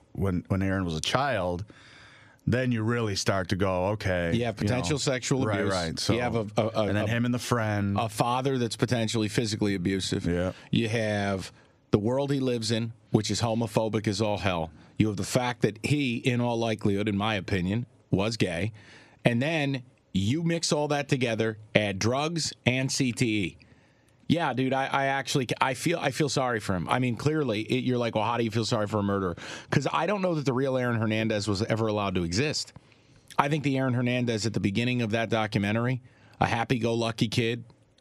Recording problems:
squashed, flat; somewhat

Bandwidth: 14.5 kHz